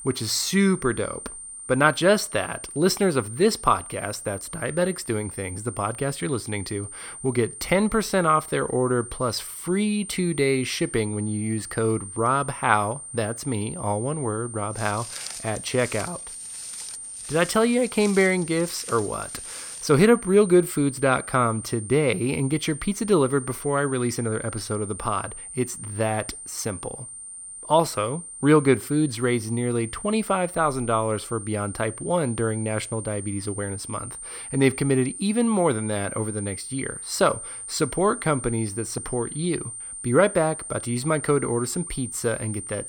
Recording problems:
high-pitched whine; noticeable; throughout; 9 kHz, 10 dB below the speech
footsteps; faint; from 15 to 20 s; peak 10 dB below the speech

